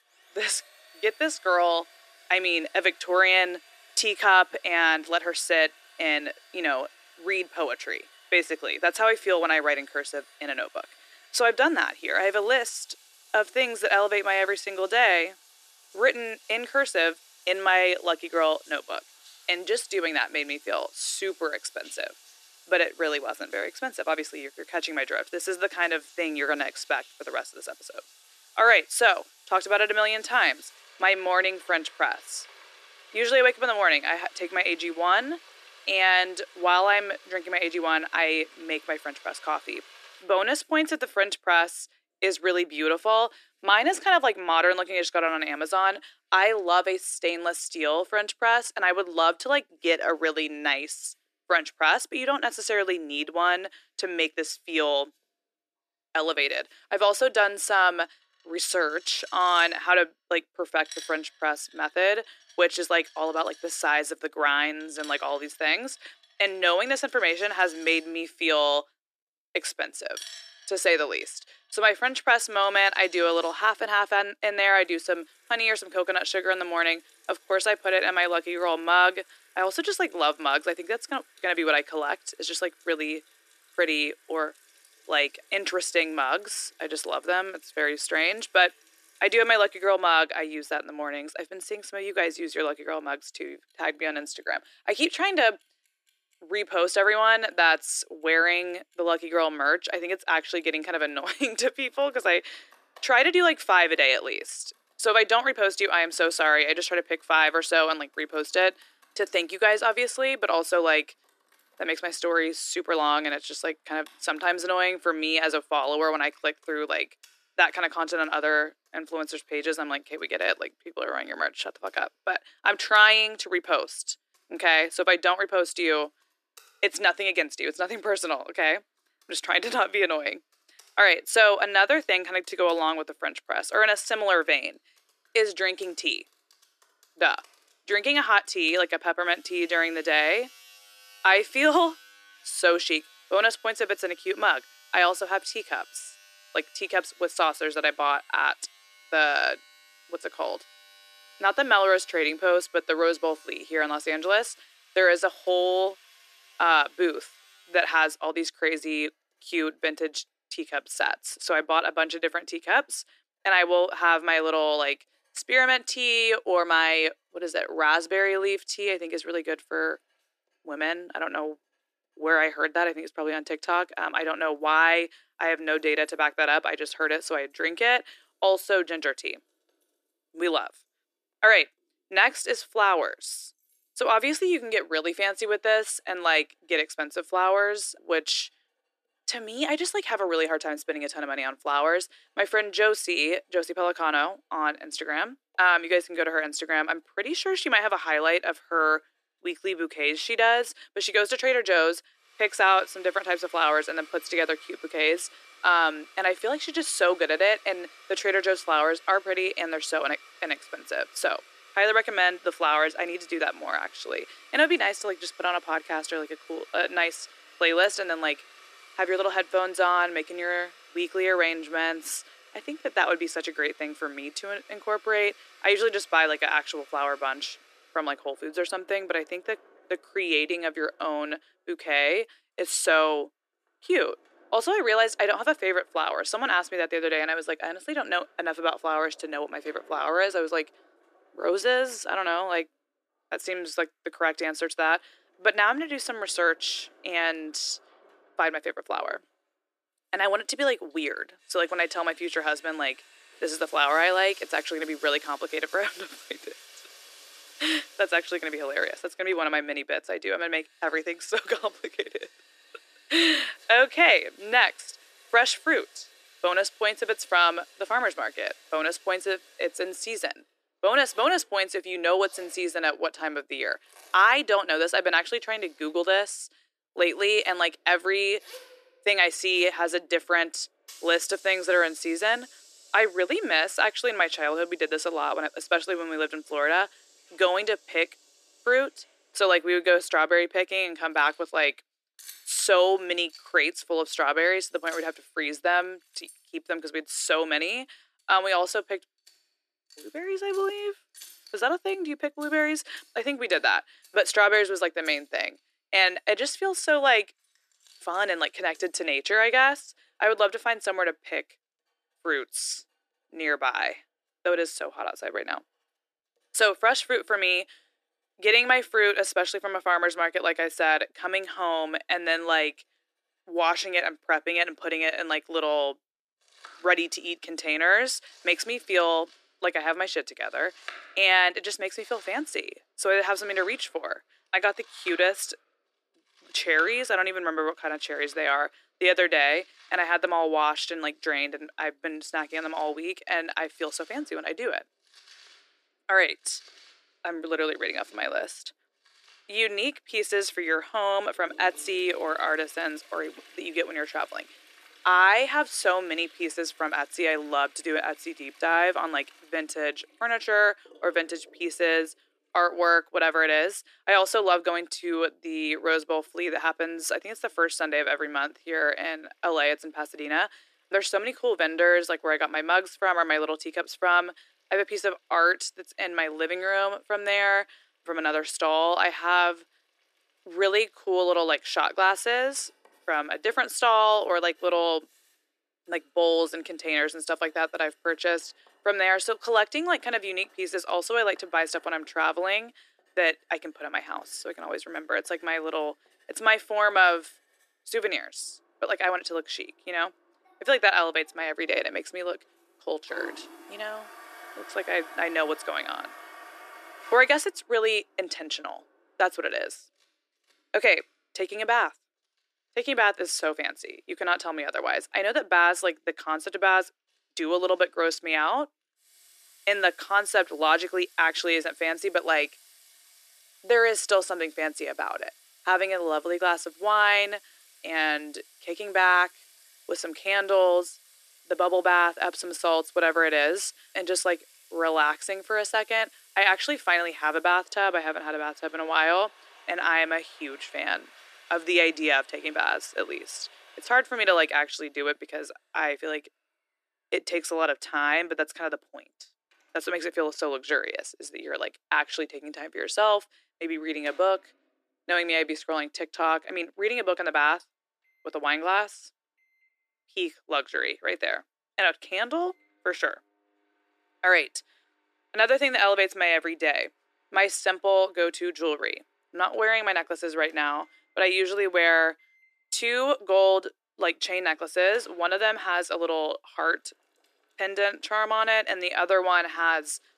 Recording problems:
thin; very; fading below 300 Hz
household noises; faint; throughout; 25 dB below the speech

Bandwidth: 14 kHz